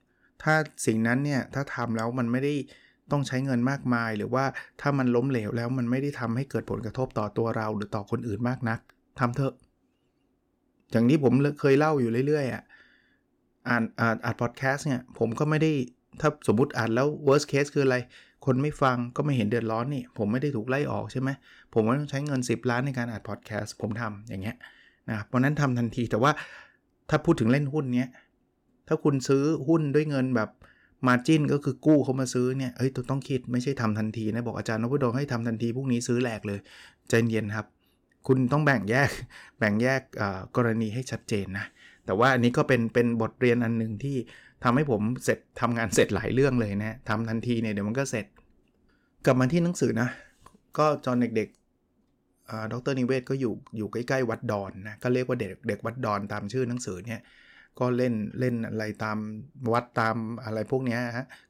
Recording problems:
none

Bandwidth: 17 kHz